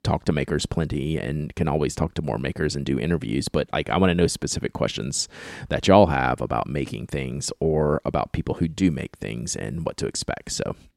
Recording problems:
none

